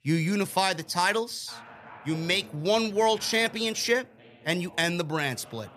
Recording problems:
voice in the background; faint; throughout; 20 dB below the speech

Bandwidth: 14.5 kHz